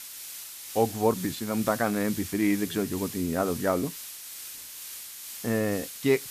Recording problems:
hiss; loud; throughout; 10 dB below the speech

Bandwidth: 14.5 kHz